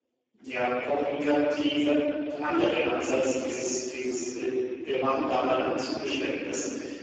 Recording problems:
room echo; strong; dies away in 2.8 s
off-mic speech; far
garbled, watery; badly
thin; very slightly; fading below 300 Hz

